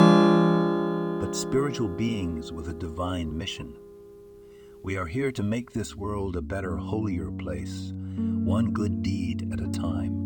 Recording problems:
background music; very loud; throughout; 4 dB above the speech

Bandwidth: 18.5 kHz